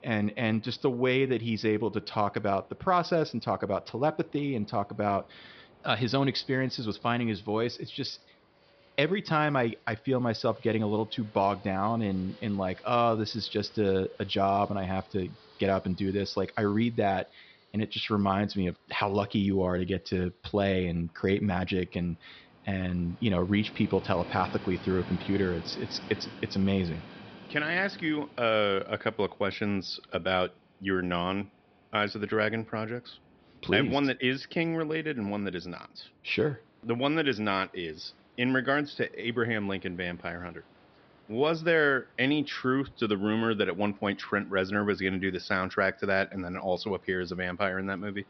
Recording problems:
high frequencies cut off; noticeable; nothing above 5.5 kHz
train or aircraft noise; faint; throughout; 25 dB below the speech

